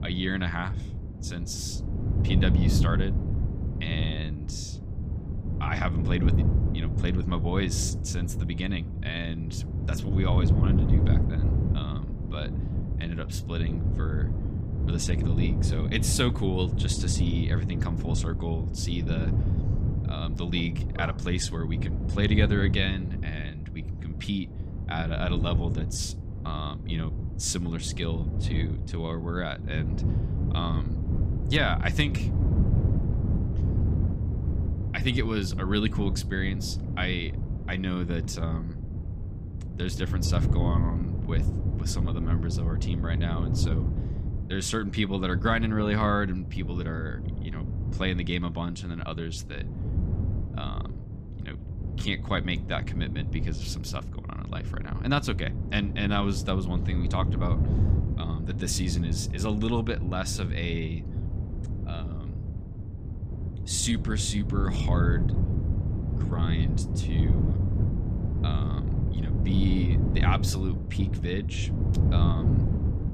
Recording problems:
wind noise on the microphone; heavy; 8 dB below the speech

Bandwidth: 15.5 kHz